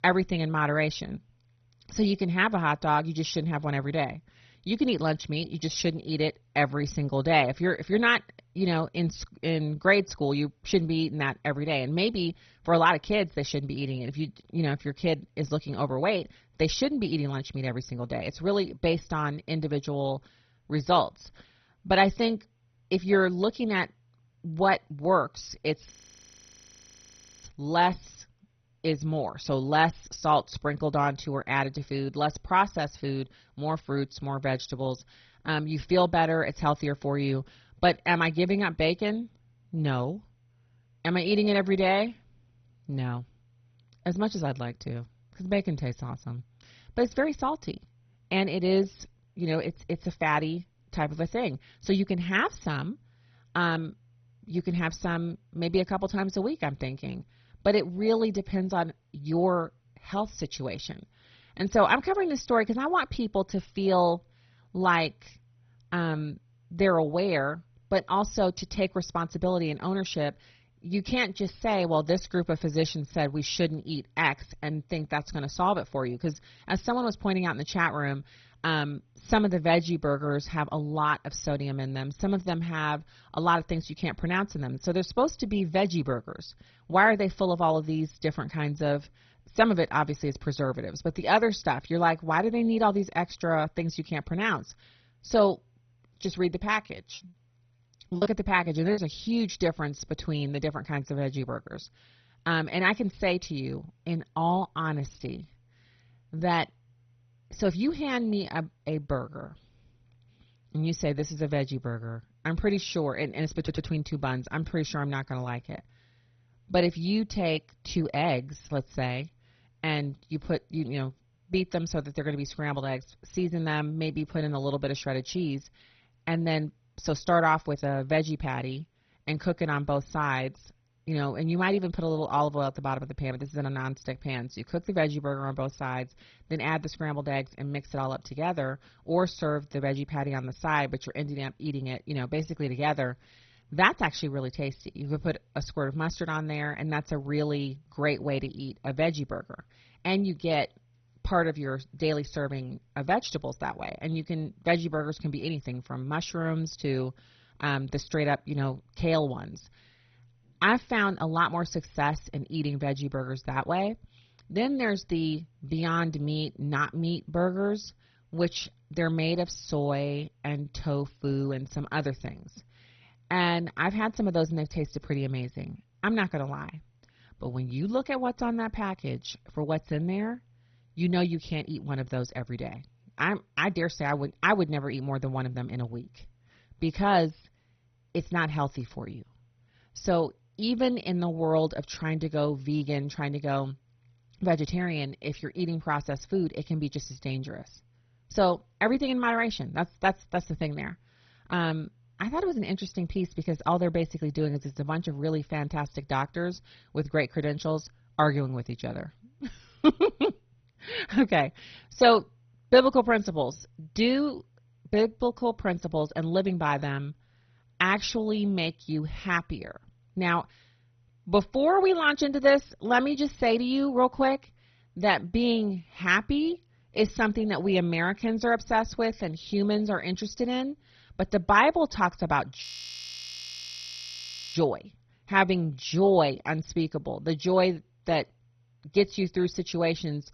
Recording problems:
garbled, watery; badly; nothing above 6 kHz
audio freezing; at 26 s for 1.5 s and at 3:53 for 2 s
choppy; very; from 1:37 to 1:39; 13% of the speech affected
audio stuttering; at 1:54

